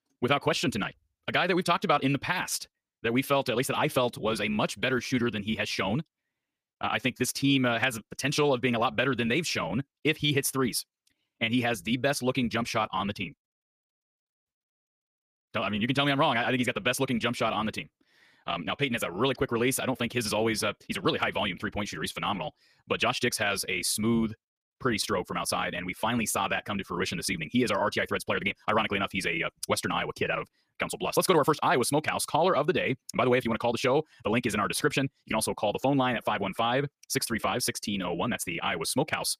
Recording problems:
wrong speed, natural pitch; too fast; 1.6 times normal speed

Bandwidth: 15 kHz